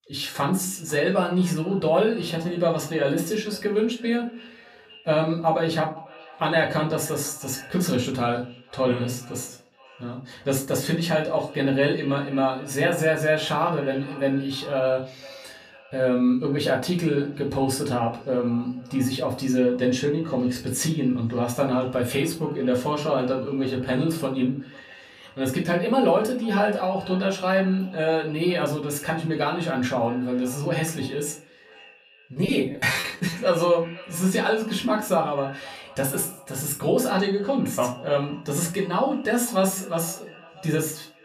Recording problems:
off-mic speech; far
echo of what is said; faint; throughout; 500 ms later, 20 dB below the speech
room echo; very slight; dies away in 0.3 s
choppy; very; at 32 s; 17% of the speech affected

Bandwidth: 14.5 kHz